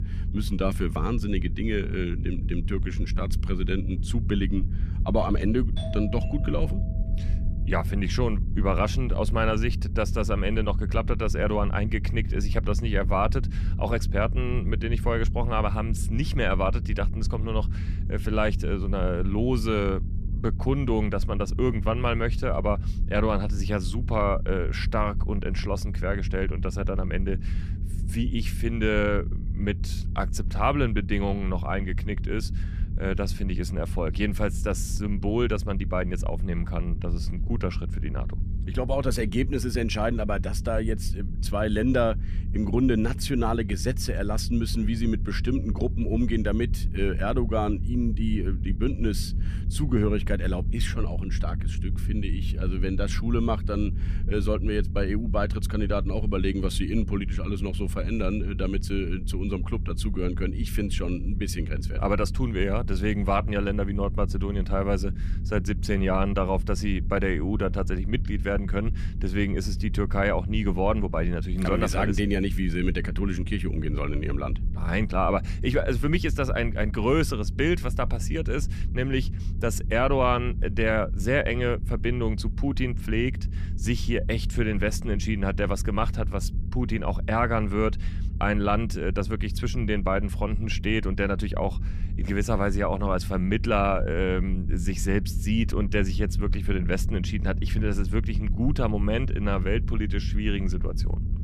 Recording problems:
low rumble; noticeable; throughout; 15 dB below the speech
doorbell; faint; from 6 to 7.5 s; peak 10 dB below the speech

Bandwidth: 14.5 kHz